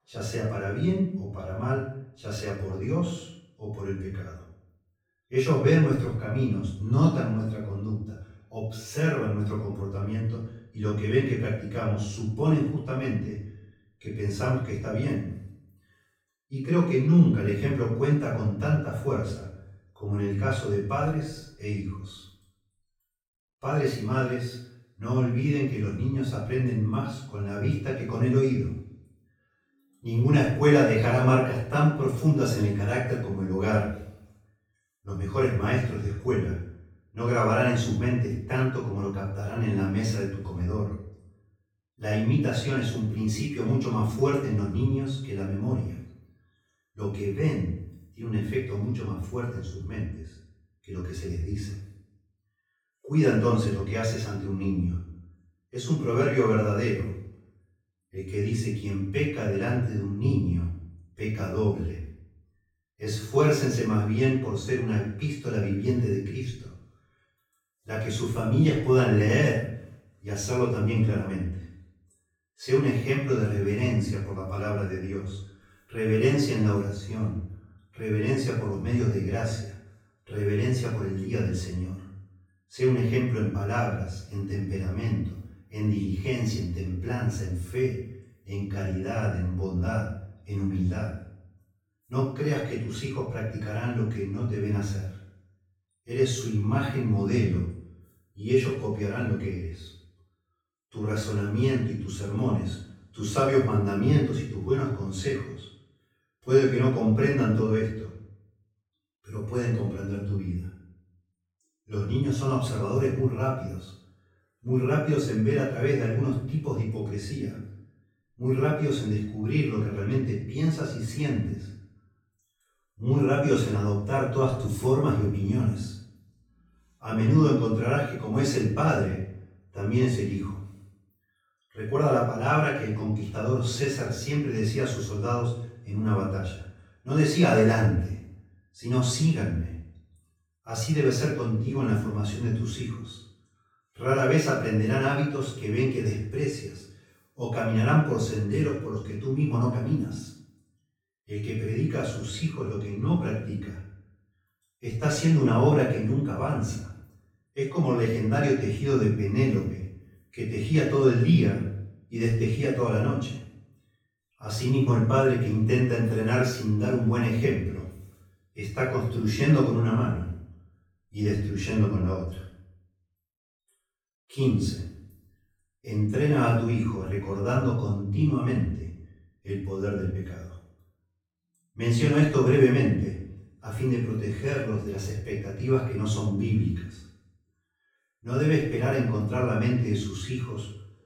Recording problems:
off-mic speech; far
room echo; noticeable; dies away in 0.6 s

